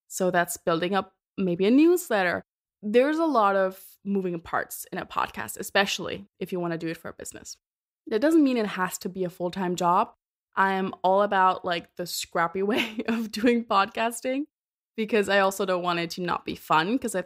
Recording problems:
none

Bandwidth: 15.5 kHz